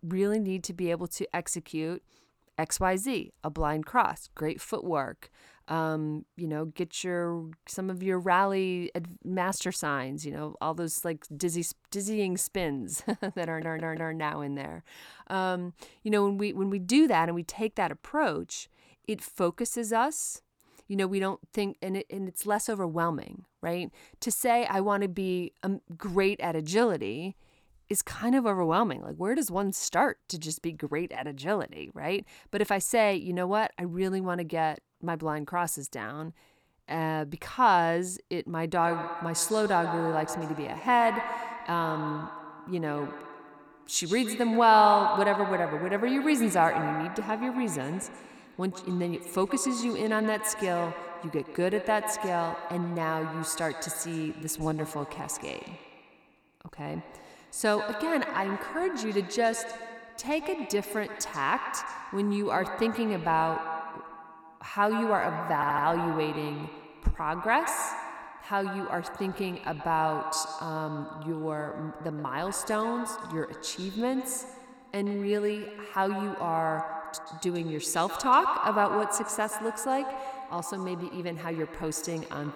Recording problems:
echo of what is said; strong; from 39 s on; 130 ms later, 7 dB below the speech
audio stuttering; at 13 s and at 1:06

